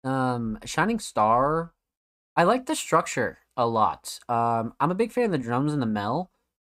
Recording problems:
none

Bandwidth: 15.5 kHz